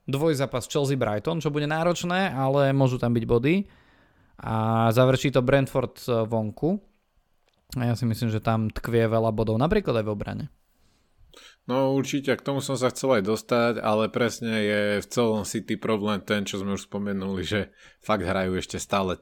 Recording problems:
none

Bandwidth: 18 kHz